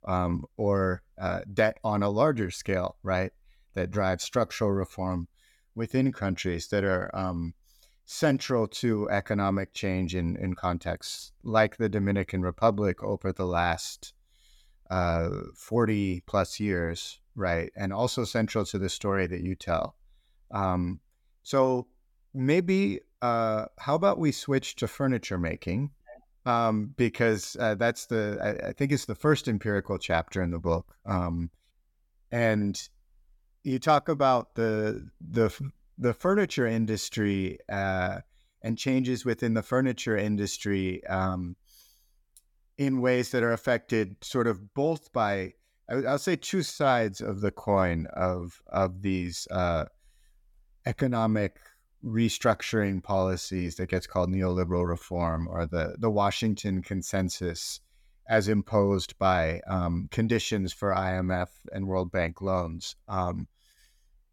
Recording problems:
none

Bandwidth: 17.5 kHz